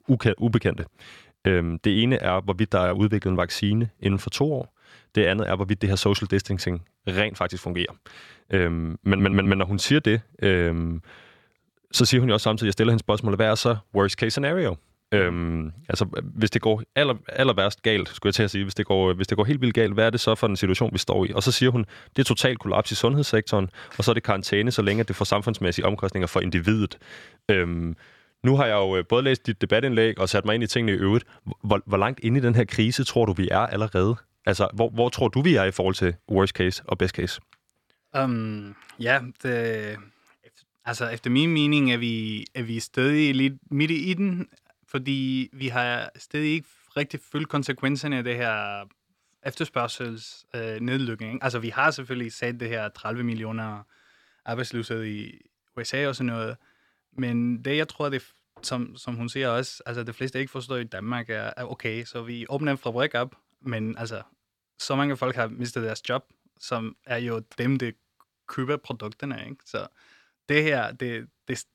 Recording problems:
audio stuttering; at 9 s

